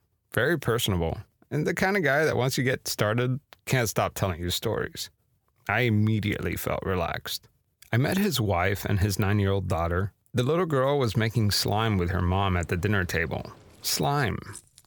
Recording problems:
household noises; faint; from 11 s on; 25 dB below the speech

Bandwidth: 18.5 kHz